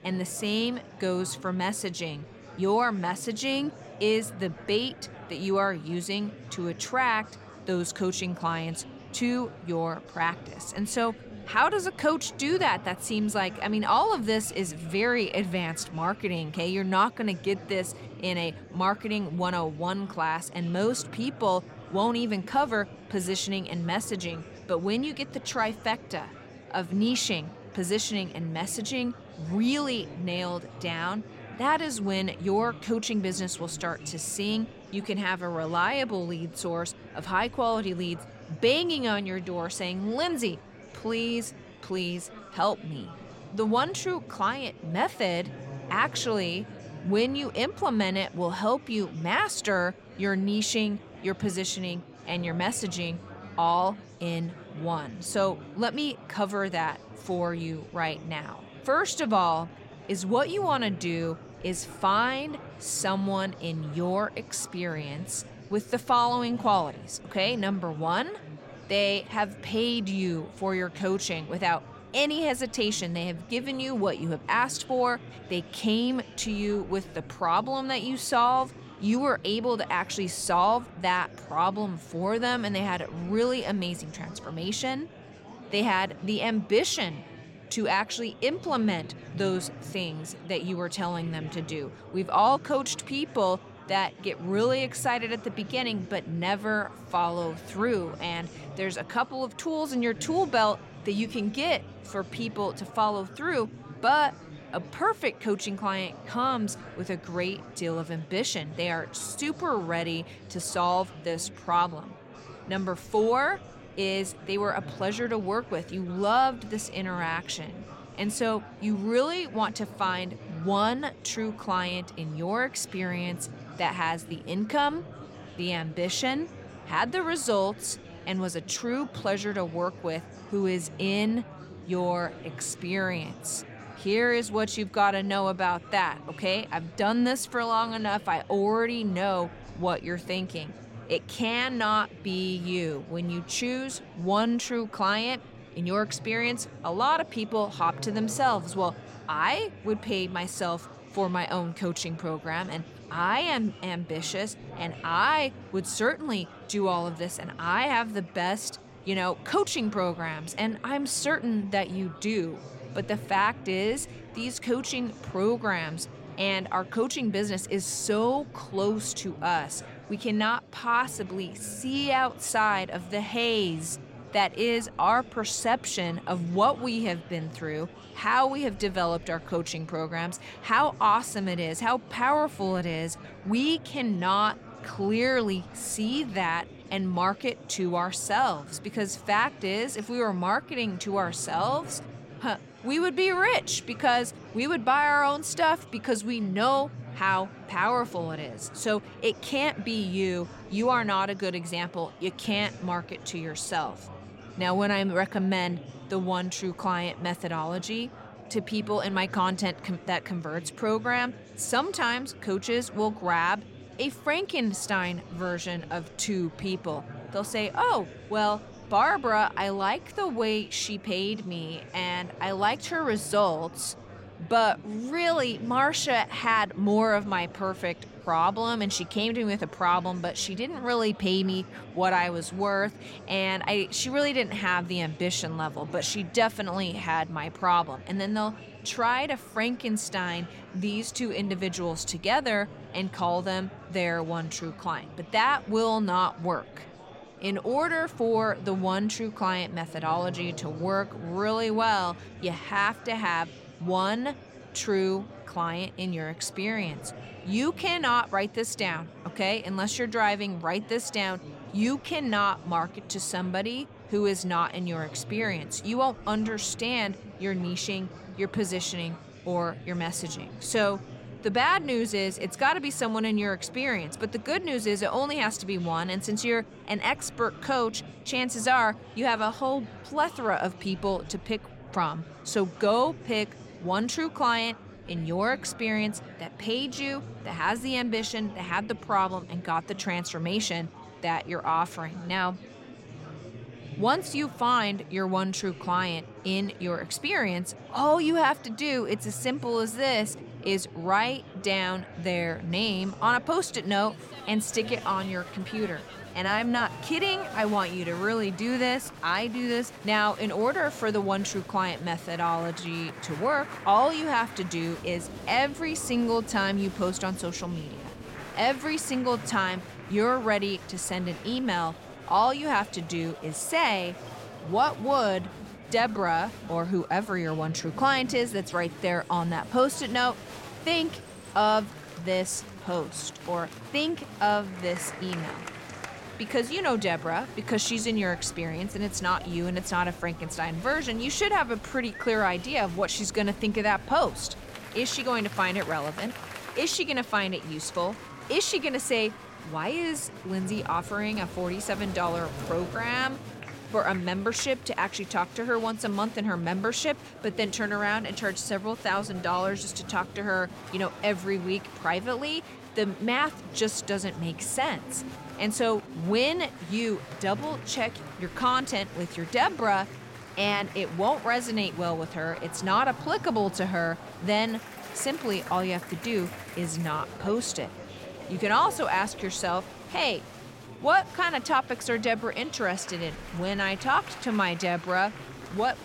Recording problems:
murmuring crowd; noticeable; throughout; 15 dB below the speech

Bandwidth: 16.5 kHz